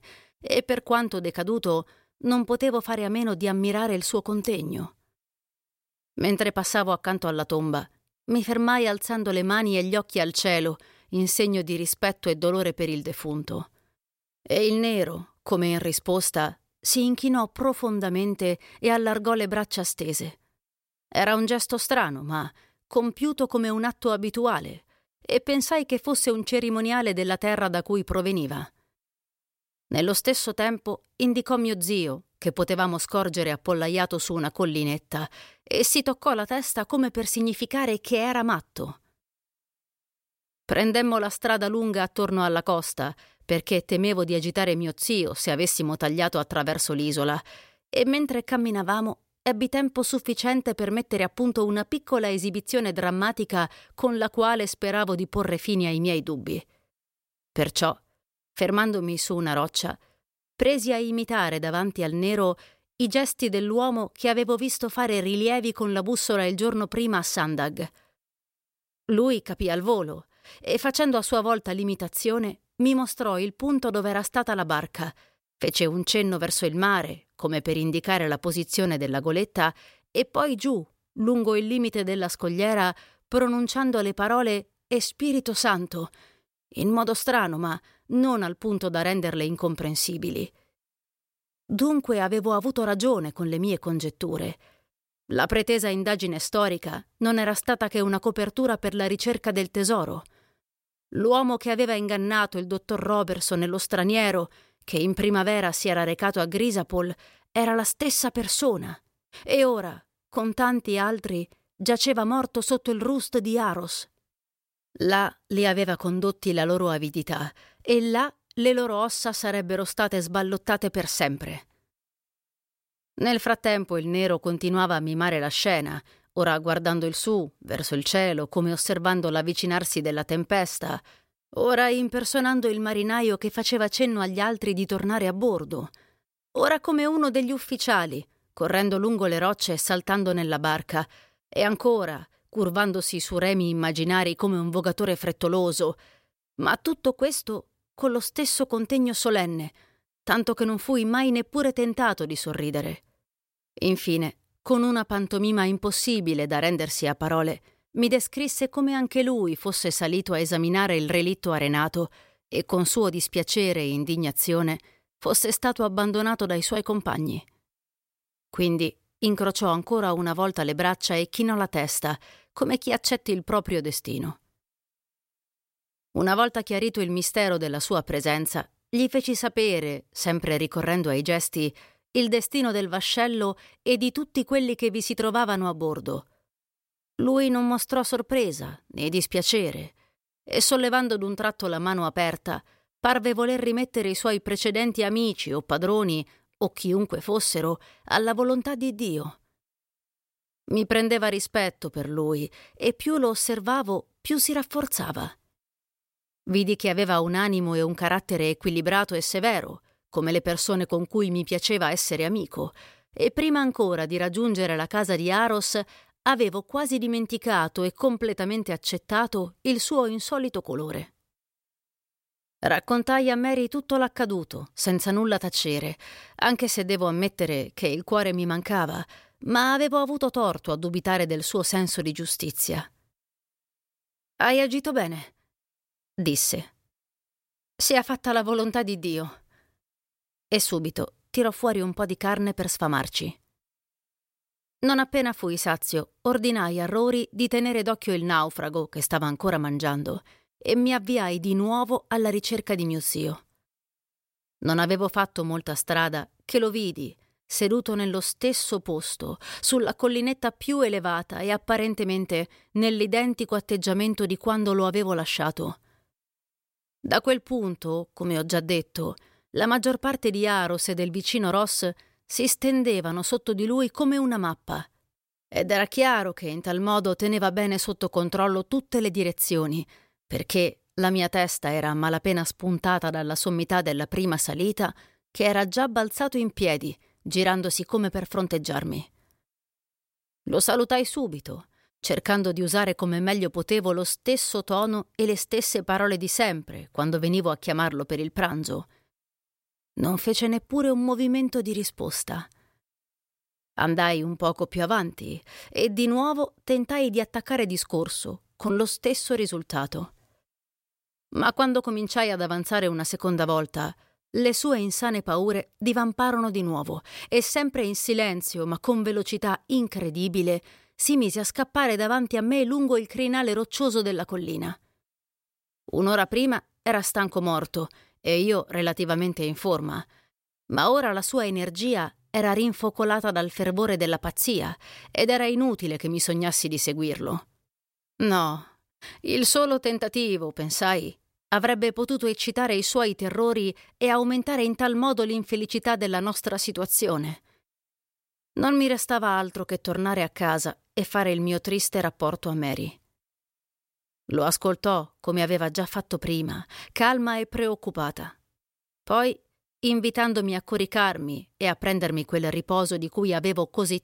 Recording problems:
none

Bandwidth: 16 kHz